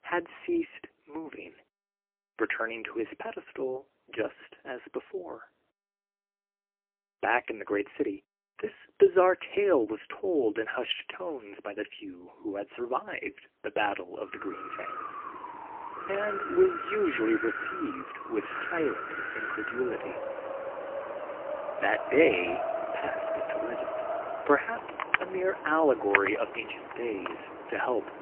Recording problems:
phone-call audio; poor line; nothing above 3 kHz
wind in the background; loud; from 14 s on; 4 dB below the speech

